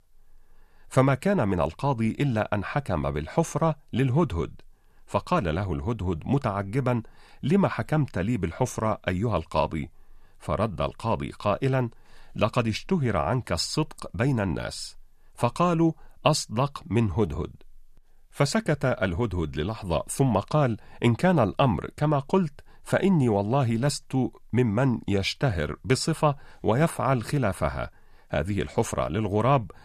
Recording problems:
none

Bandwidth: 14.5 kHz